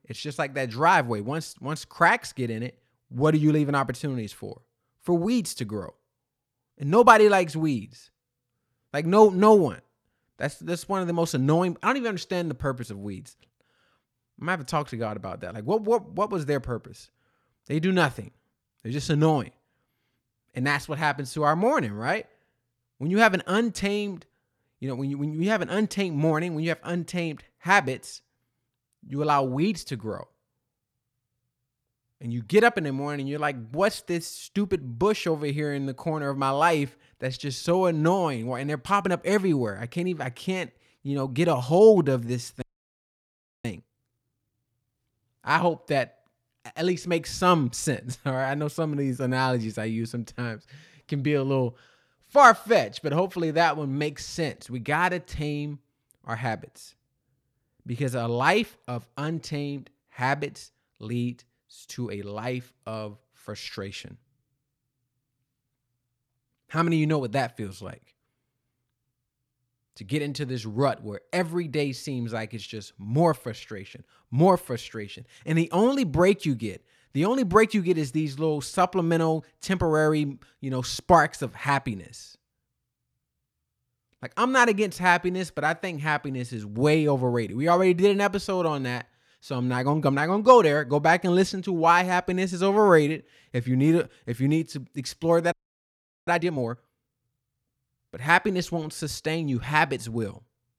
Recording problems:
audio freezing; at 43 s for 1 s and at 1:36 for 1 s

